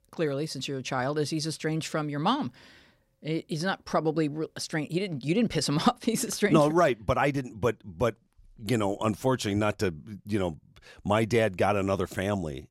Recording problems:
none

